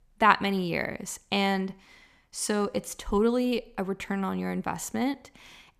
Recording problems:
none

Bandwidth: 14.5 kHz